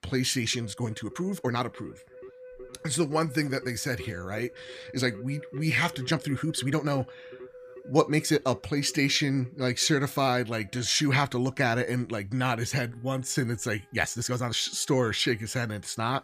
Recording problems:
background music; noticeable; throughout; 20 dB below the speech
uneven, jittery; strongly; from 0.5 to 15 s

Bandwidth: 14.5 kHz